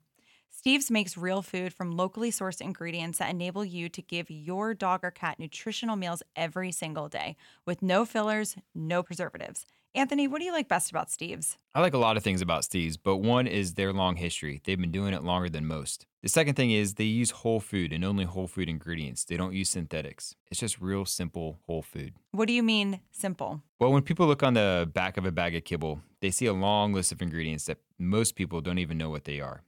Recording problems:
none

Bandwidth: 18 kHz